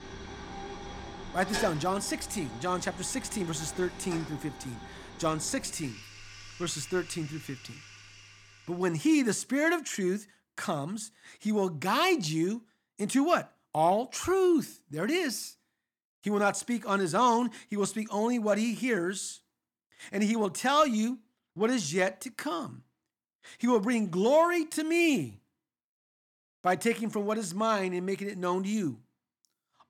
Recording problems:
household noises; noticeable; until 8.5 s; 15 dB below the speech

